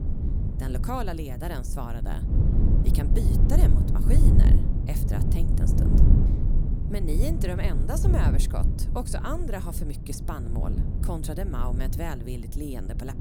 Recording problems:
low rumble; loud; throughout; 2 dB below the speech

